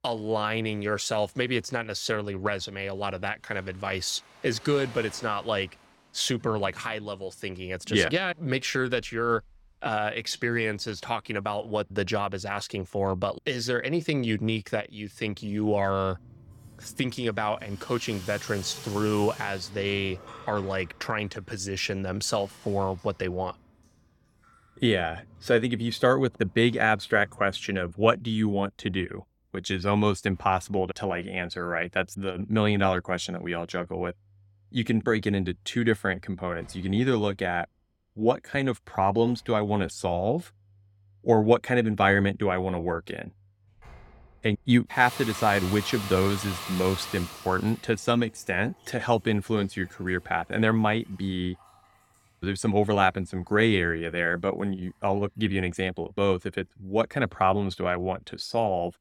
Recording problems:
household noises; noticeable; throughout; 15 dB below the speech

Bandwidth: 17 kHz